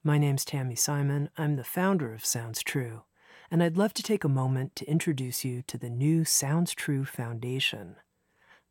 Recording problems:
none

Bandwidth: 16.5 kHz